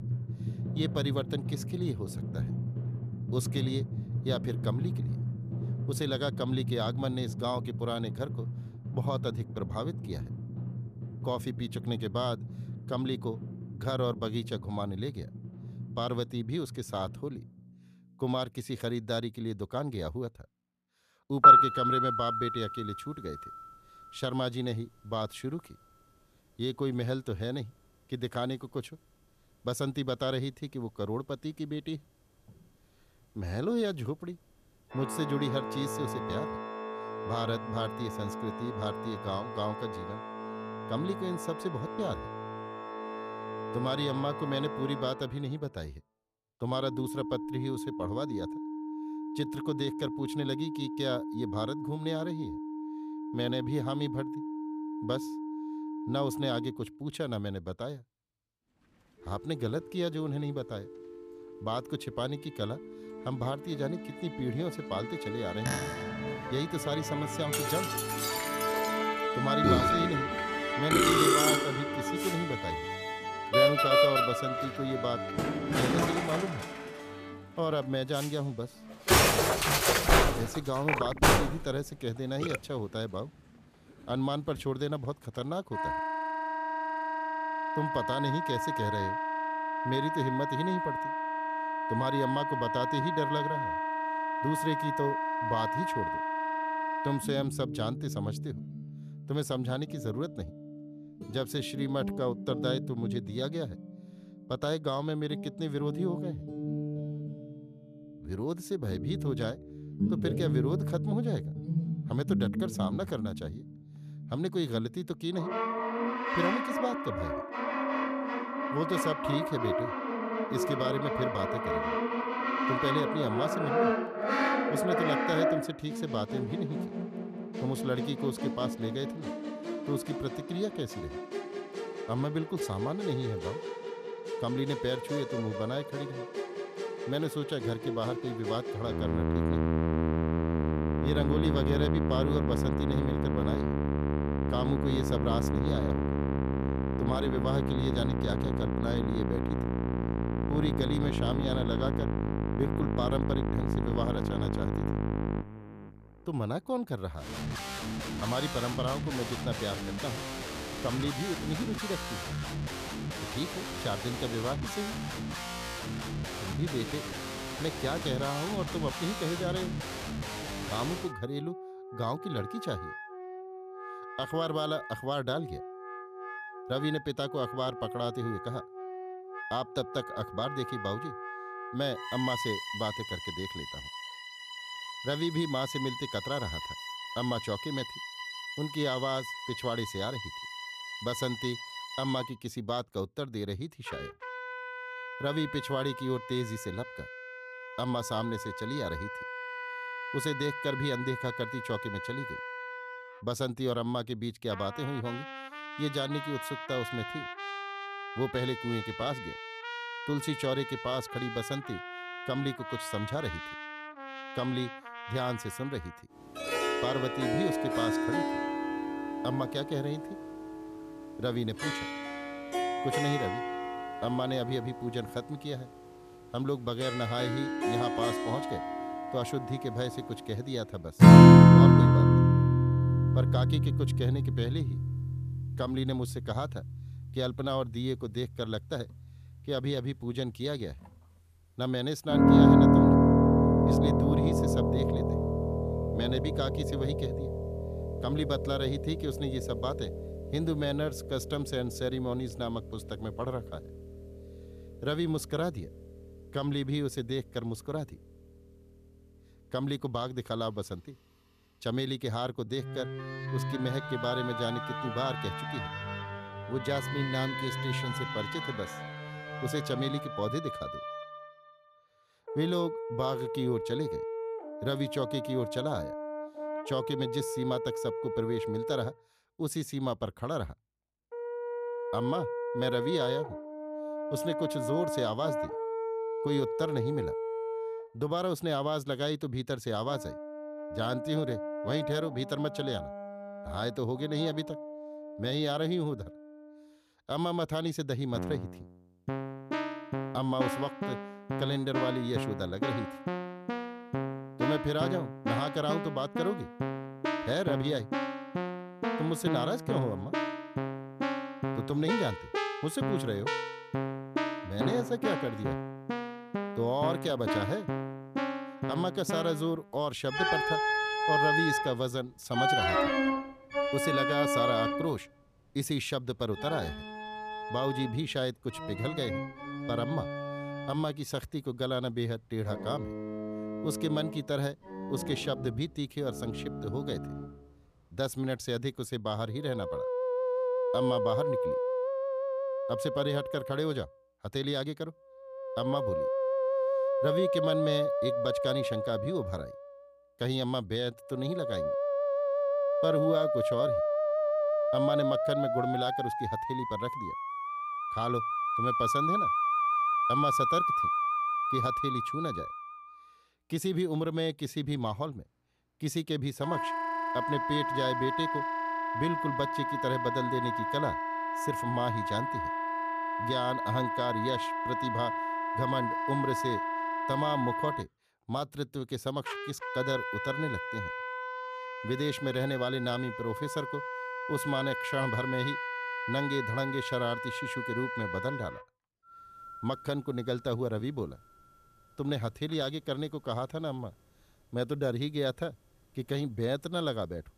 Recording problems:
background music; very loud; throughout; 3 dB above the speech

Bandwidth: 14.5 kHz